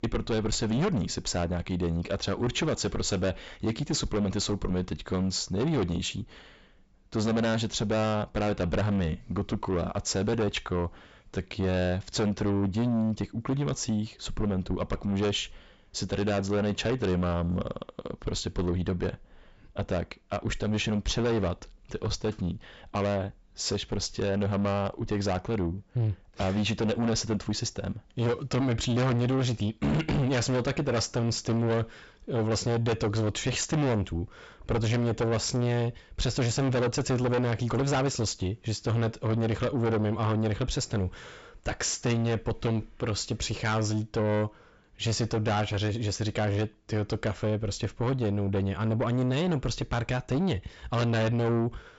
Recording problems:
distortion; heavy; 6 dB below the speech
high frequencies cut off; noticeable; nothing above 8 kHz

